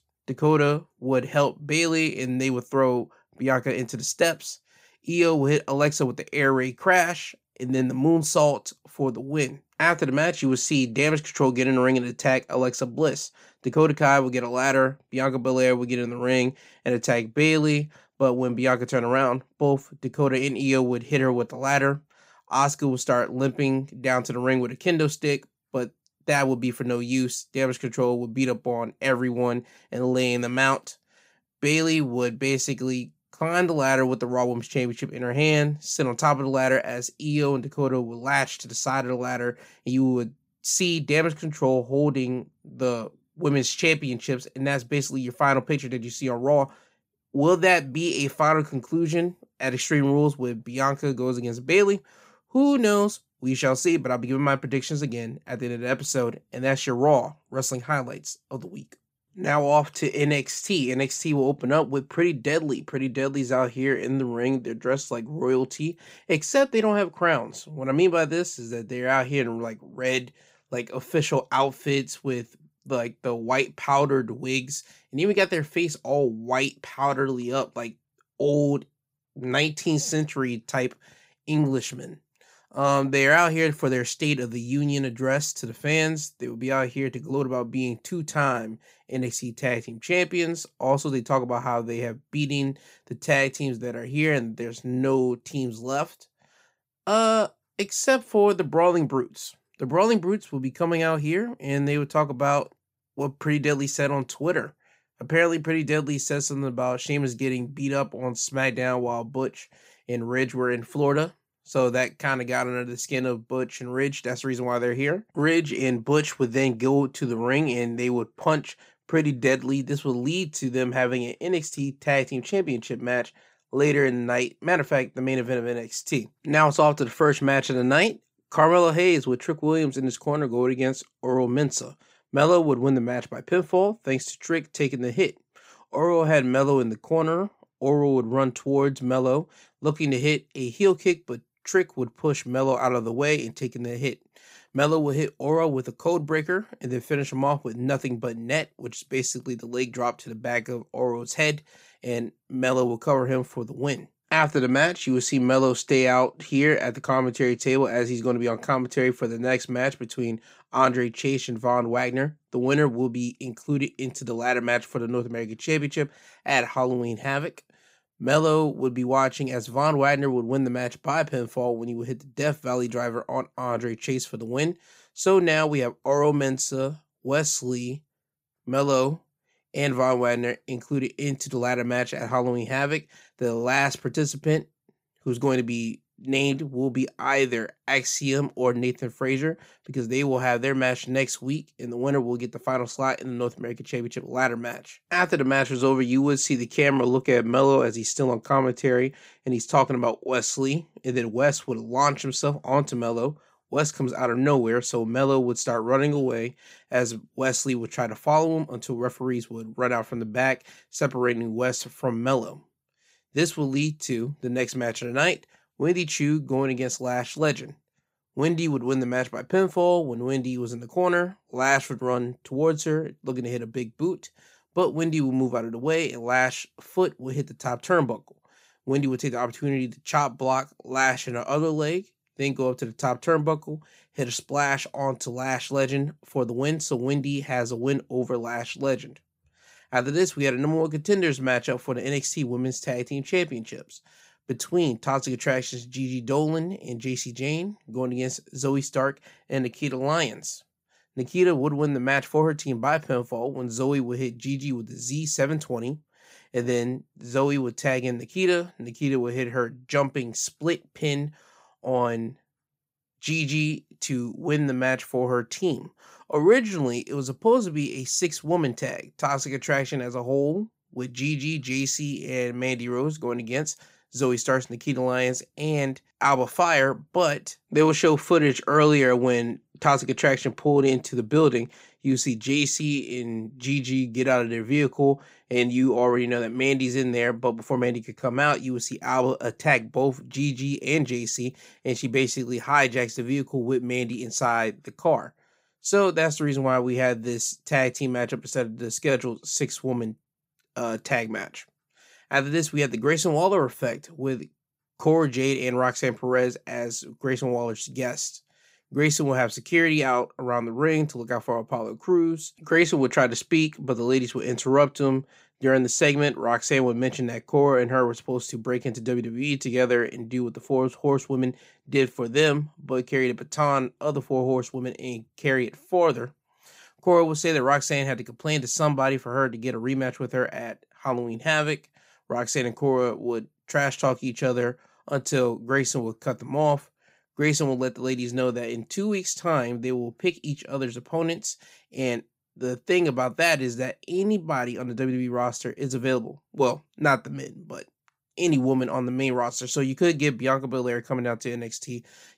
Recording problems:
none

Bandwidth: 15.5 kHz